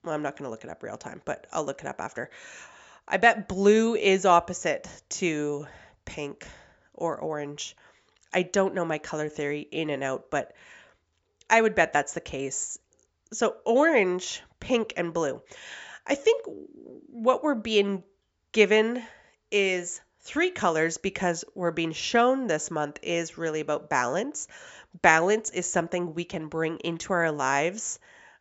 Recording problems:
high frequencies cut off; noticeable; nothing above 8 kHz

